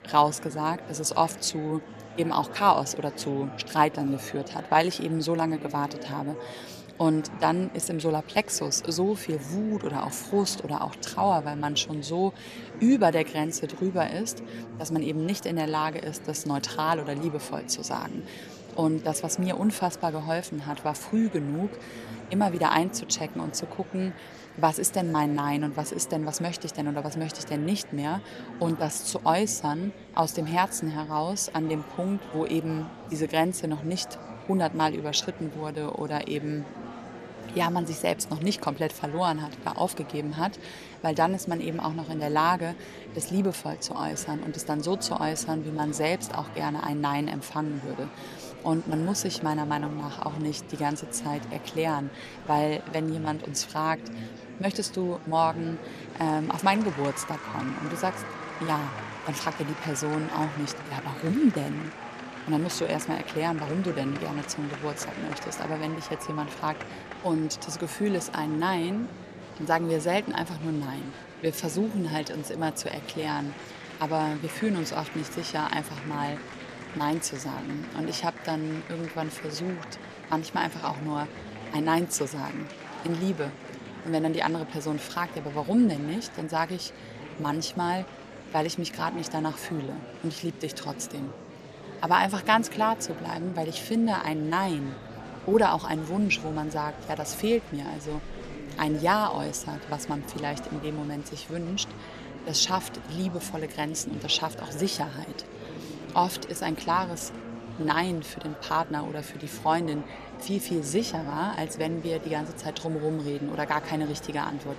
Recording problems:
murmuring crowd; noticeable; throughout; 10 dB below the speech

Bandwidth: 14 kHz